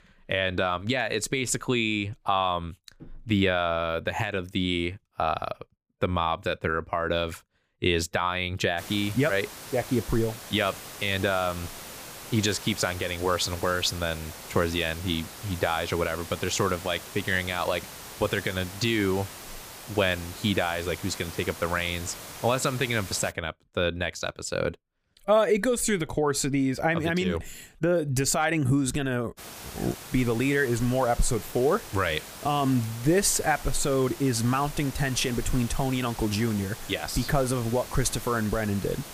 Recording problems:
hiss; noticeable; from 9 to 23 s and from 29 s on; 15 dB below the speech

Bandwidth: 15 kHz